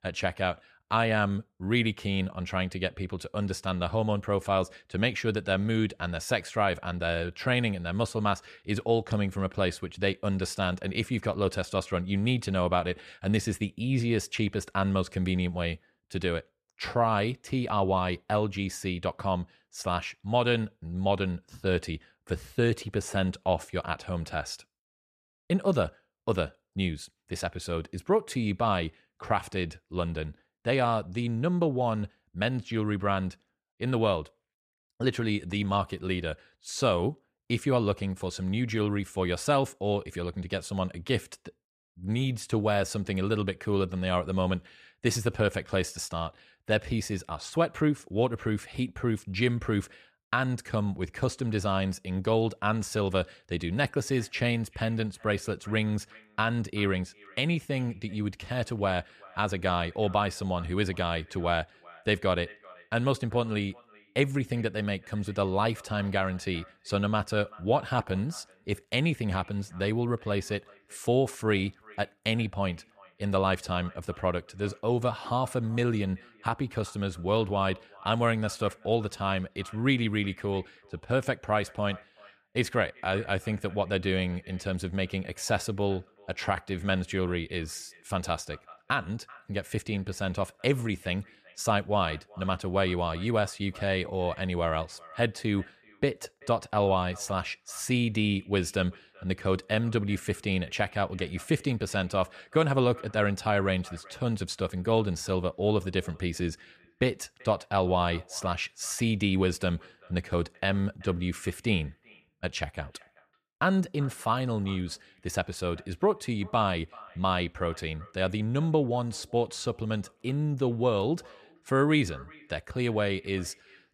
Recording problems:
echo of what is said; faint; from 54 s on; 380 ms later, 25 dB below the speech

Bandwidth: 14.5 kHz